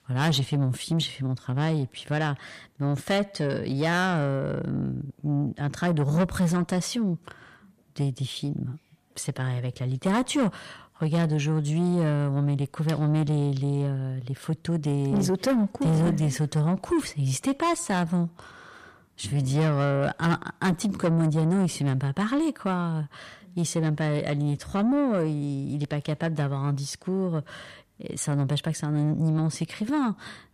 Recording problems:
distortion; slight; 10 dB below the speech

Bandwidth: 14.5 kHz